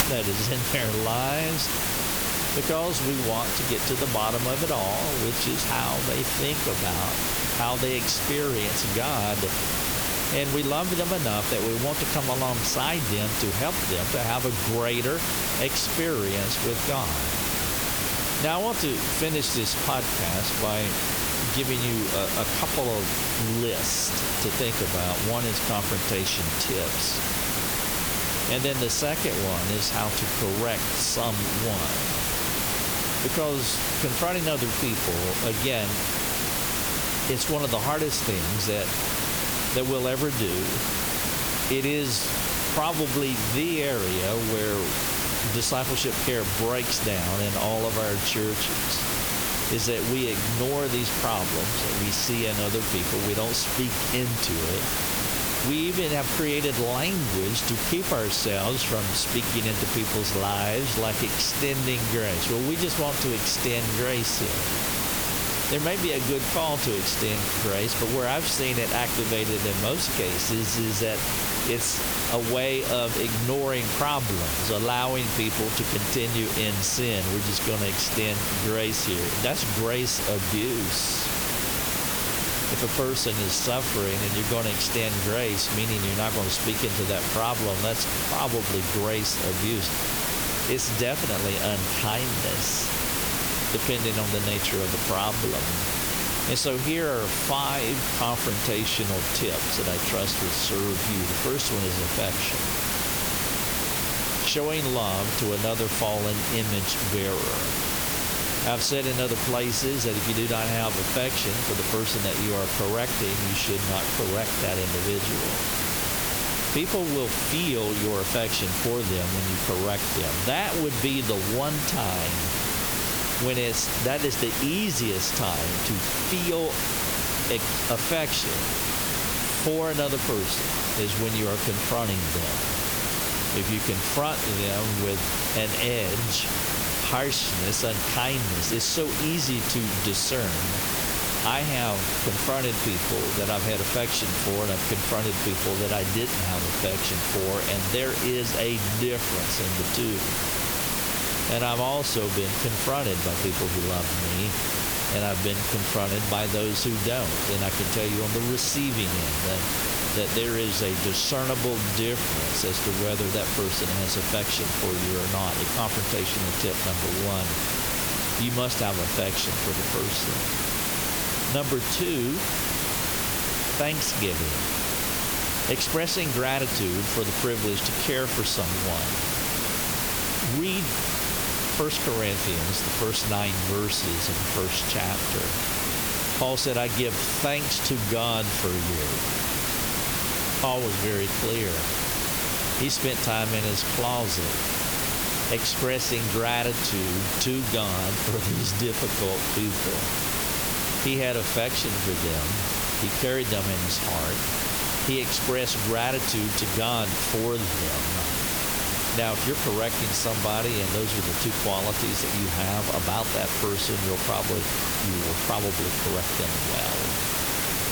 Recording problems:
squashed, flat; somewhat
hiss; very loud; throughout; 2 dB above the speech

